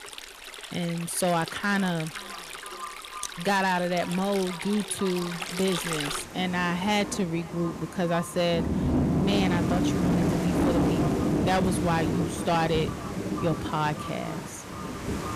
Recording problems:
echo of what is said; noticeable; throughout; 500 ms later, 15 dB below the speech
distortion; slight; 9% of the sound clipped
rain or running water; loud; throughout; 2 dB below the speech

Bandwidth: 14.5 kHz